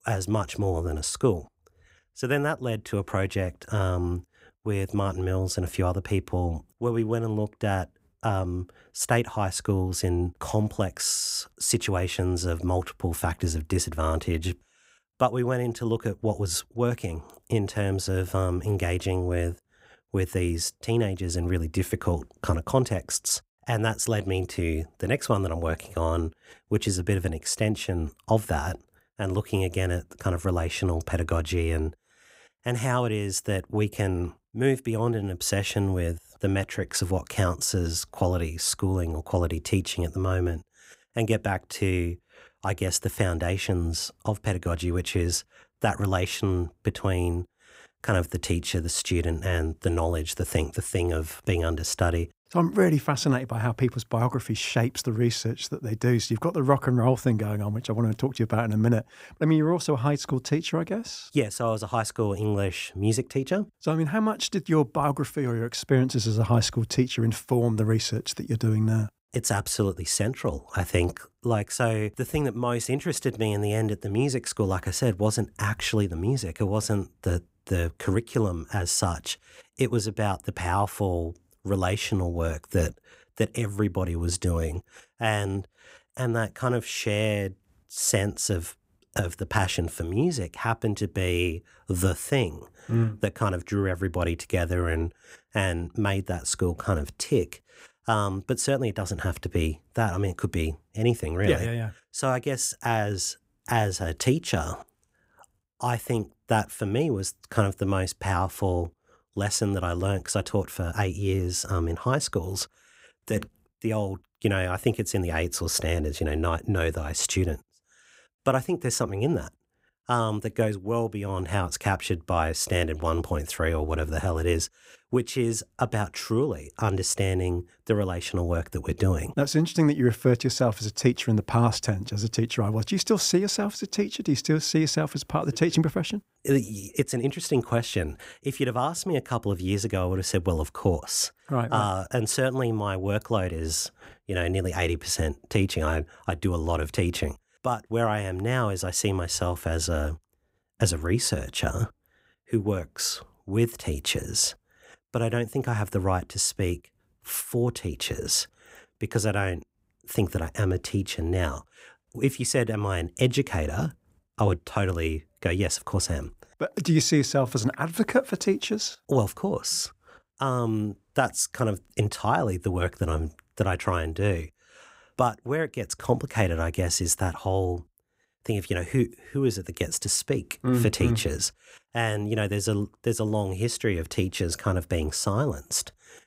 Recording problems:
none

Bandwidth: 15.5 kHz